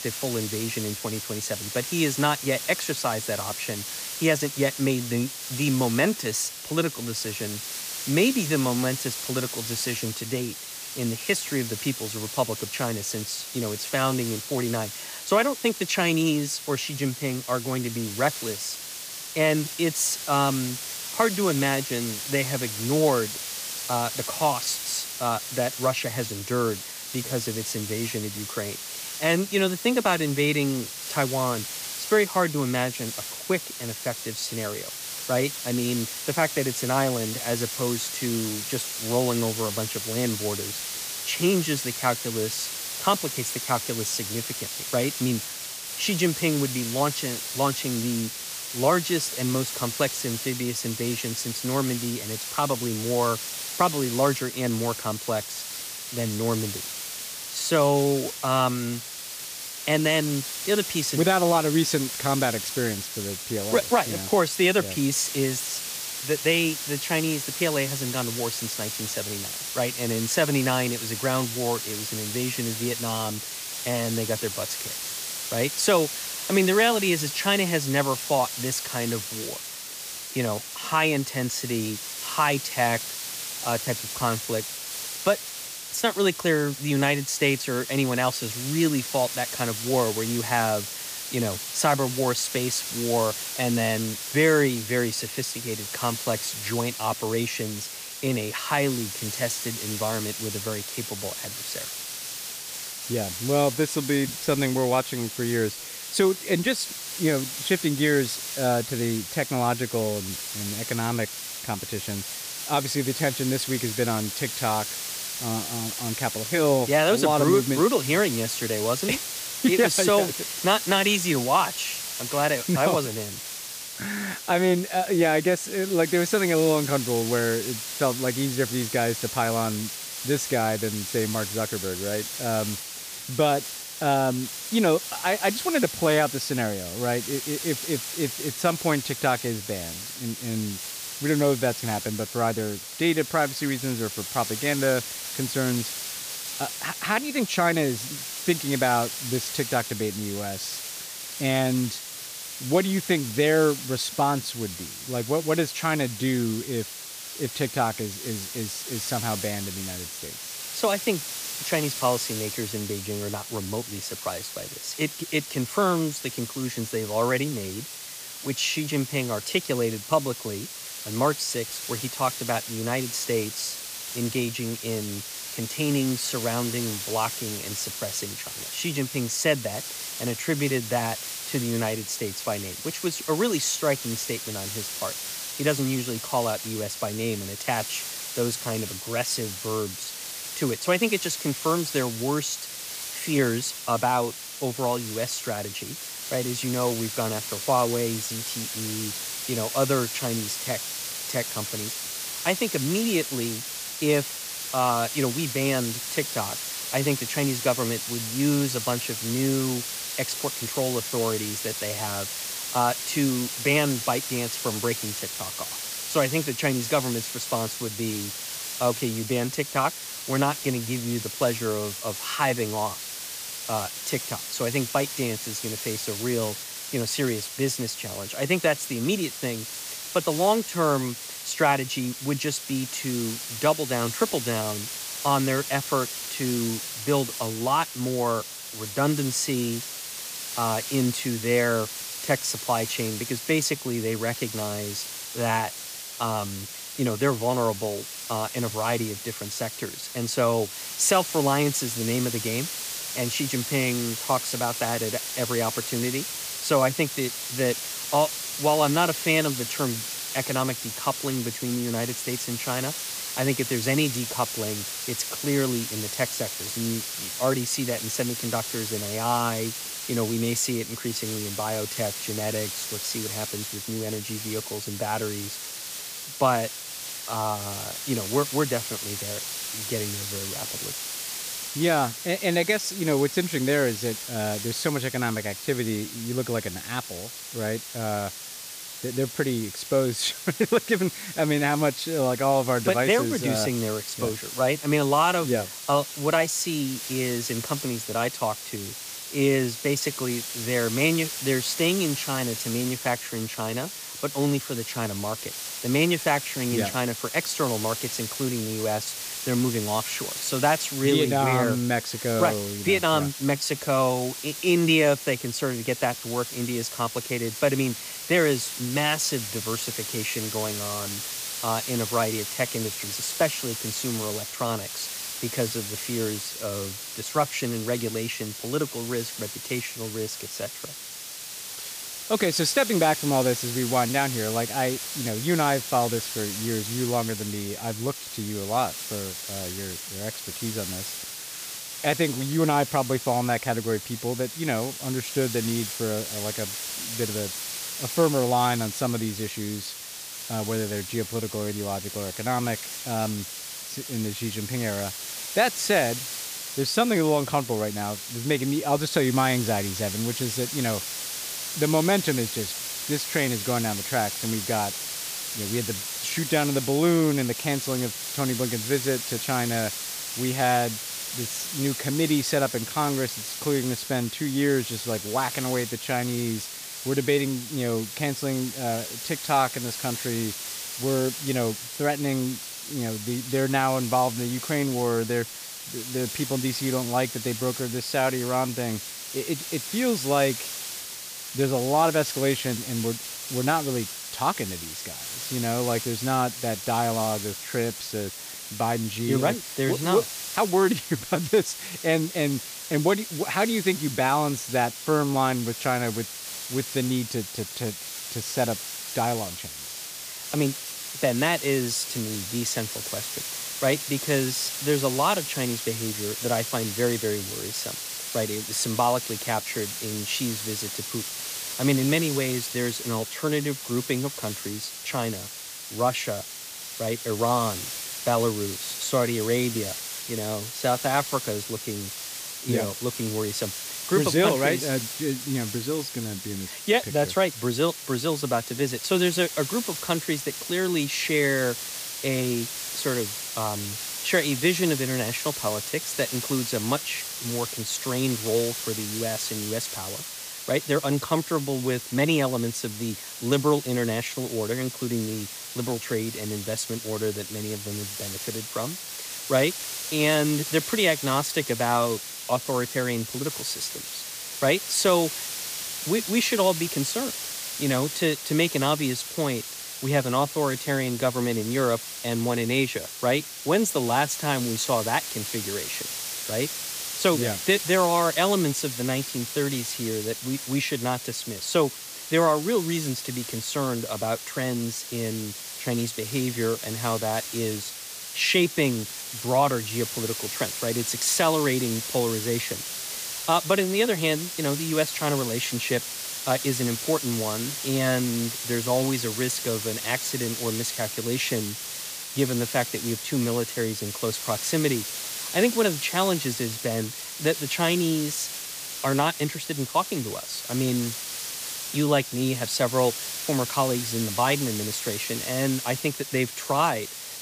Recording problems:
hiss; loud; throughout; 5 dB below the speech

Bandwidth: 15 kHz